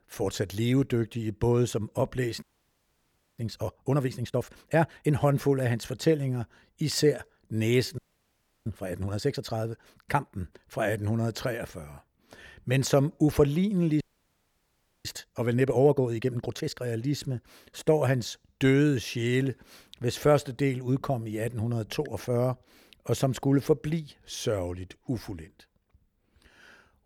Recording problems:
audio freezing; at 2.5 s for 1 s, at 8 s for 0.5 s and at 14 s for 1 s

